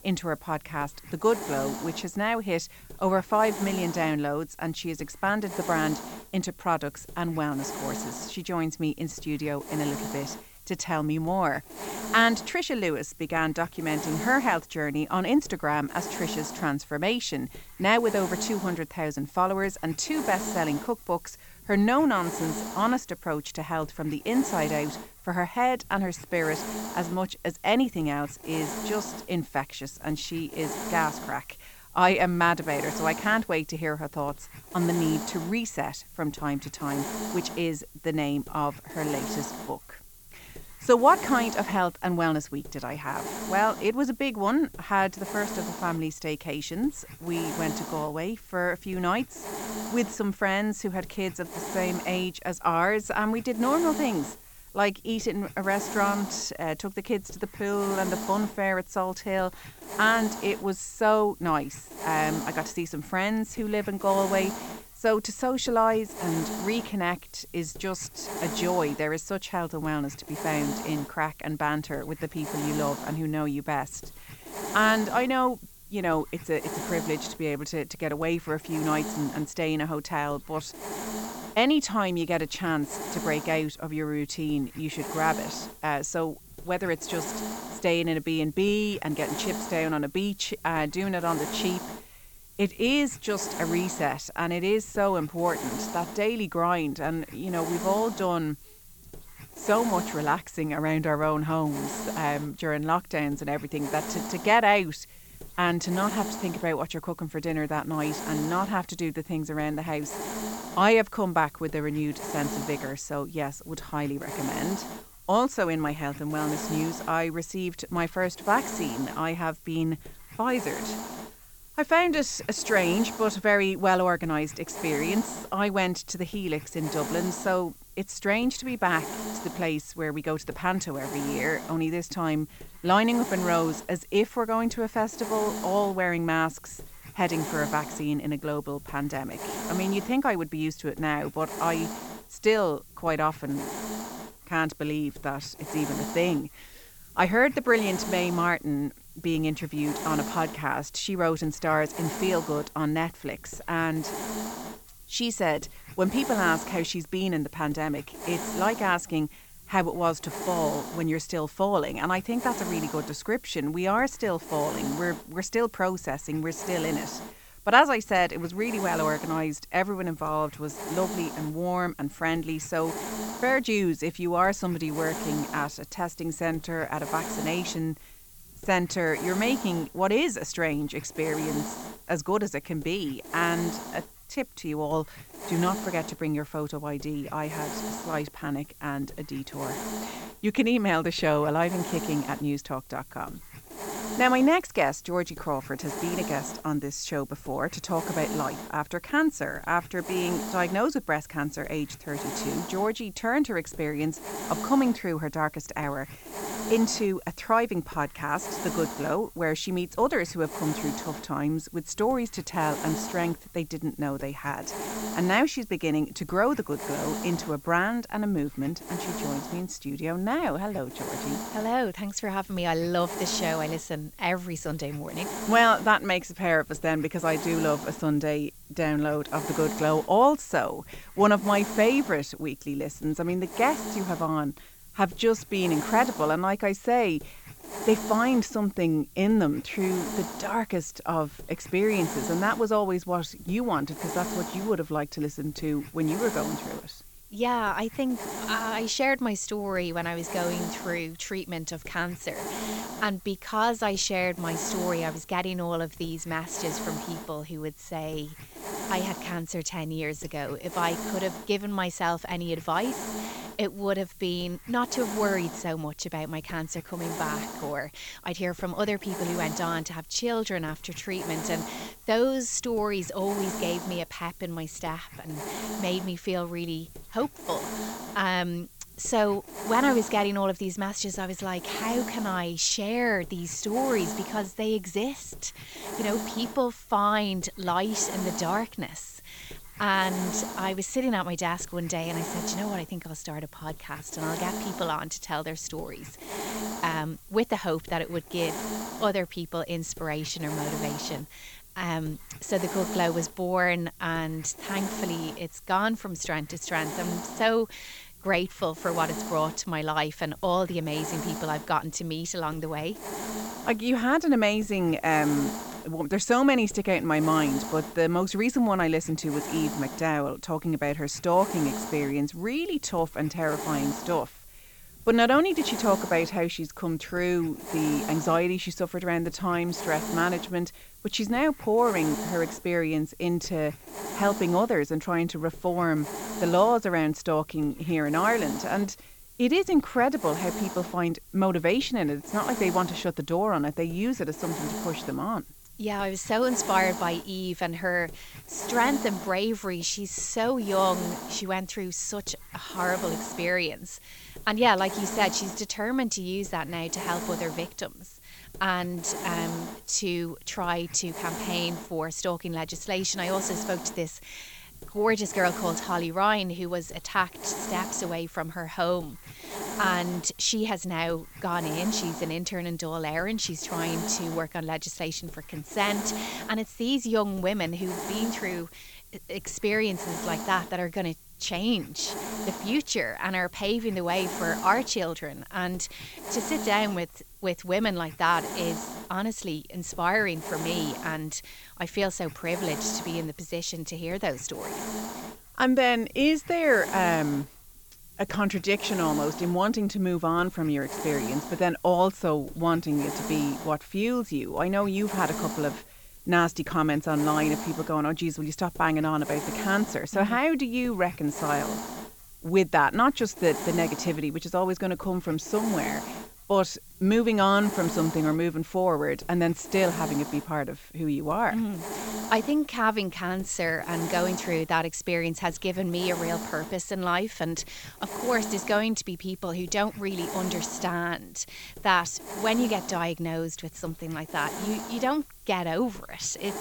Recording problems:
high frequencies cut off; noticeable; nothing above 8 kHz
hiss; loud; throughout; 10 dB below the speech

